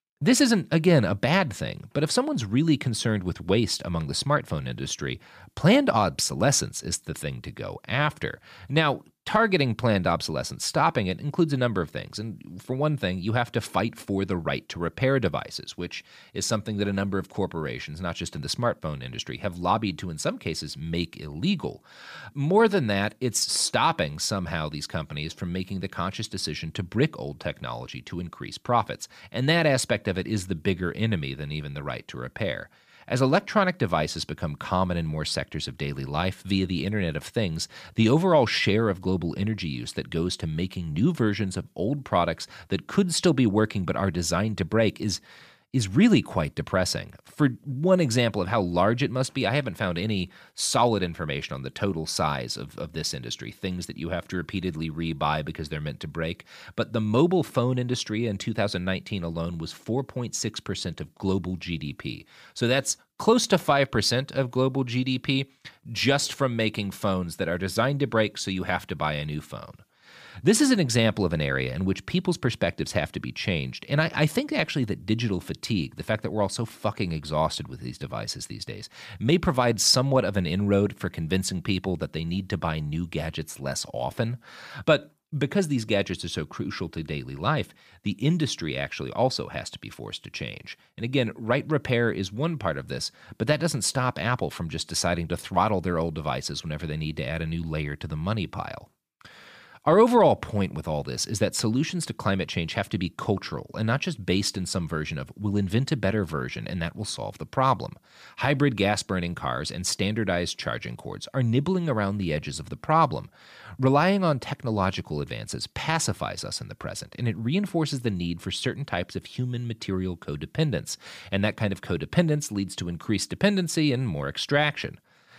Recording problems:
none

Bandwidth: 15 kHz